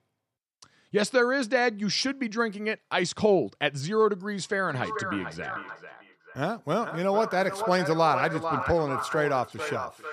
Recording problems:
echo of what is said; strong; from 4.5 s on; 440 ms later, 7 dB below the speech

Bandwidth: 14 kHz